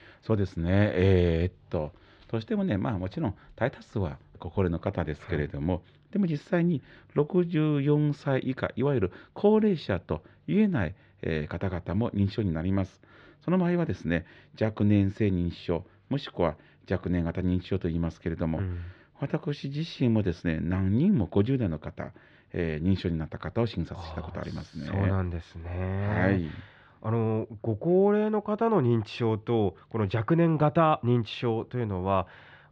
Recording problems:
muffled; slightly; fading above 3.5 kHz

